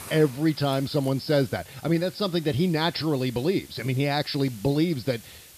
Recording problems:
high frequencies cut off; noticeable; nothing above 5.5 kHz
hiss; noticeable; throughout; 20 dB below the speech

